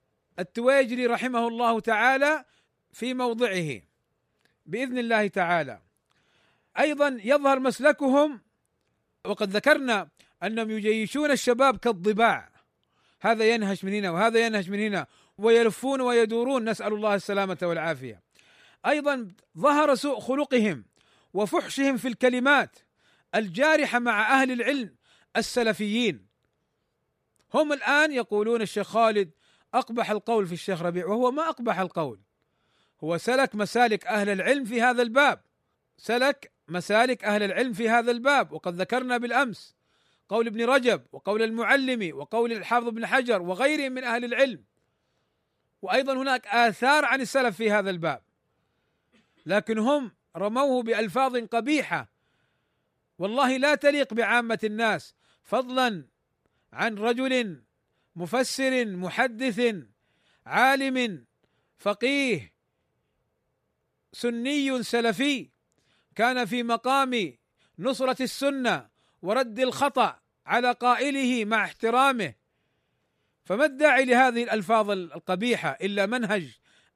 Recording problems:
none

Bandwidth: 15 kHz